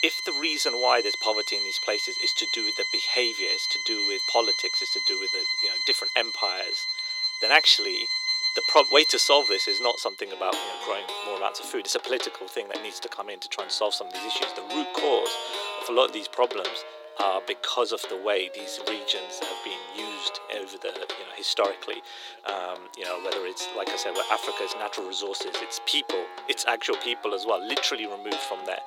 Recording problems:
thin; very; fading below 350 Hz
background music; loud; throughout; as loud as the speech

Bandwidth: 16.5 kHz